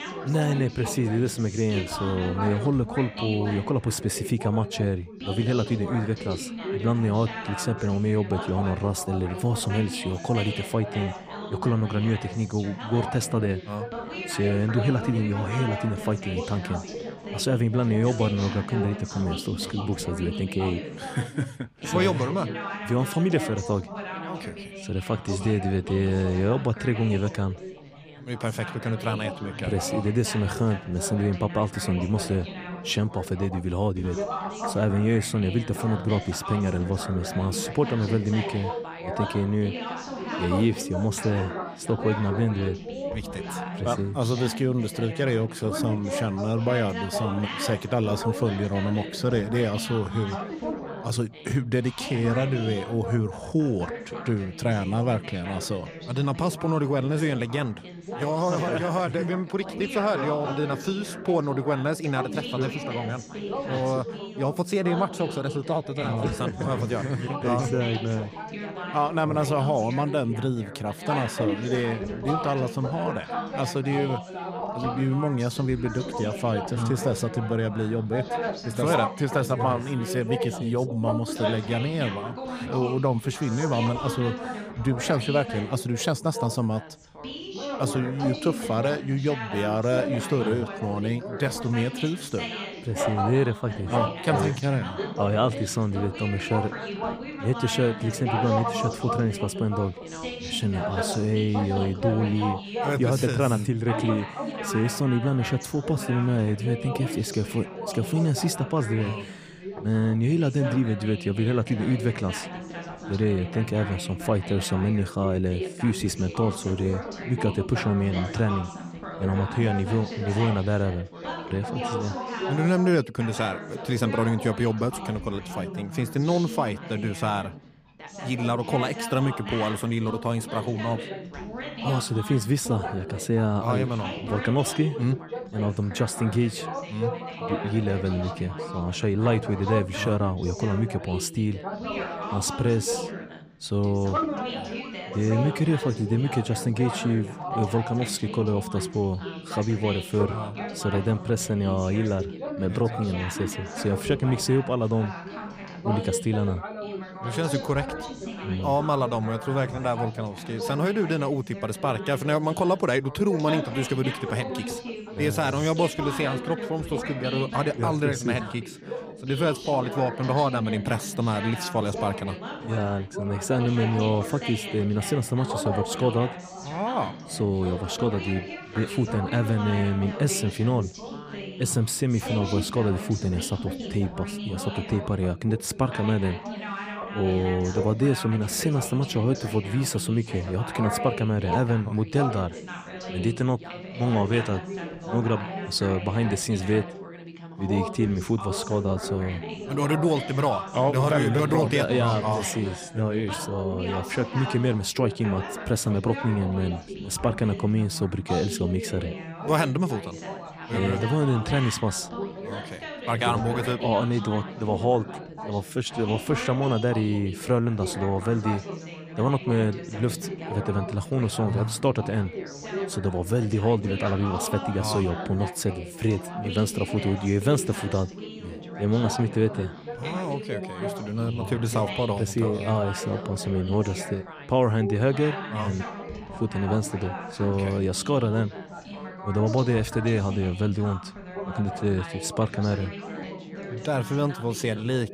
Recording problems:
background chatter; loud; throughout; 3 voices, 8 dB below the speech

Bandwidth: 15 kHz